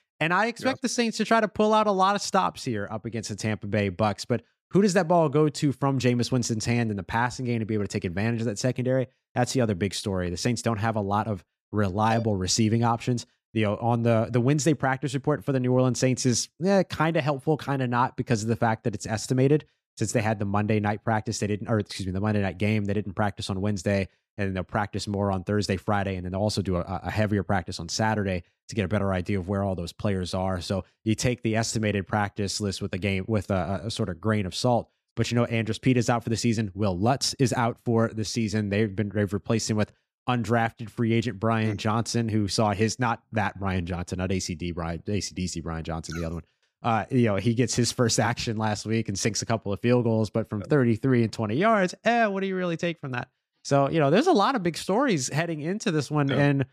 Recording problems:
none

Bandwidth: 14.5 kHz